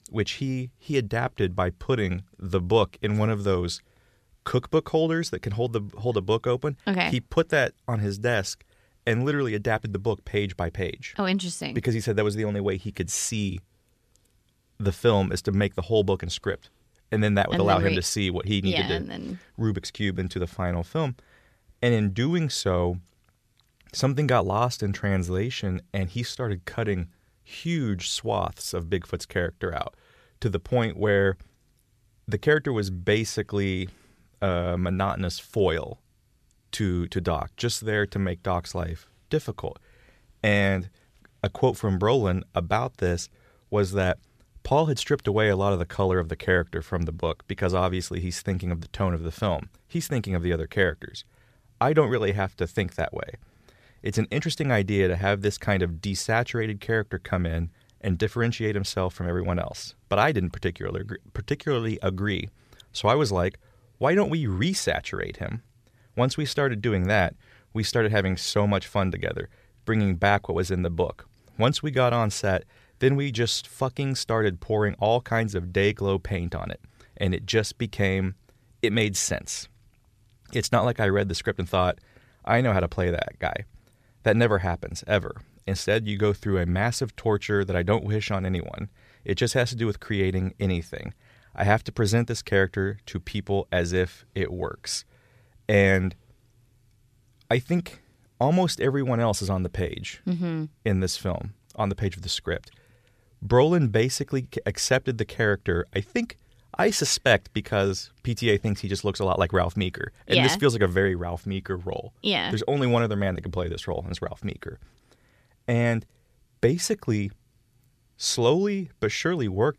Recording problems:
none

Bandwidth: 14.5 kHz